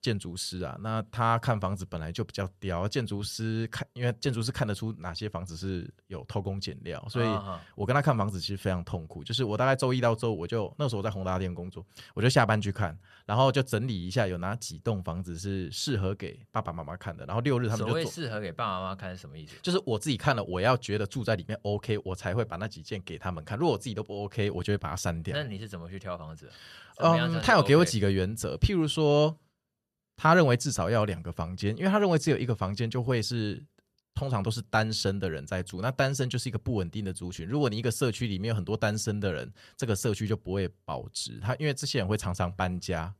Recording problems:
none

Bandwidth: 13.5 kHz